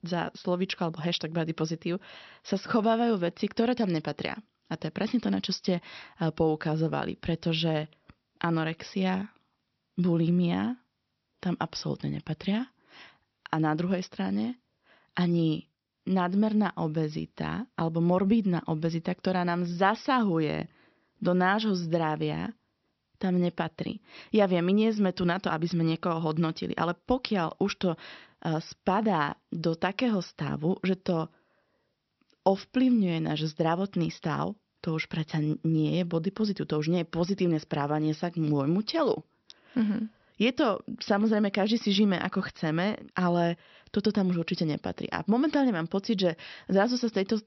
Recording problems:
high frequencies cut off; noticeable; nothing above 5.5 kHz

